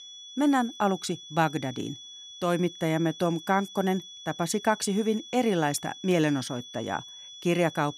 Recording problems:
high-pitched whine; noticeable; throughout; 3.5 kHz, 15 dB below the speech

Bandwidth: 15 kHz